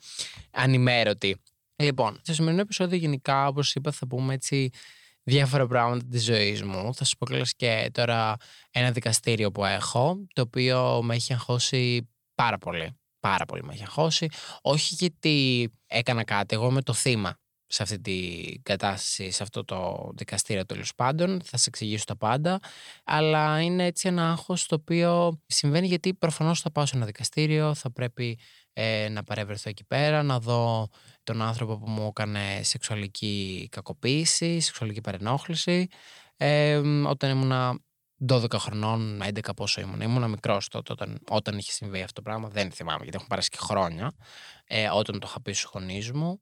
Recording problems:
none

